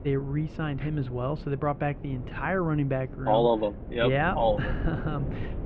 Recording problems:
muffled; very; fading above 3 kHz
wind noise on the microphone; occasional gusts; 15 dB below the speech

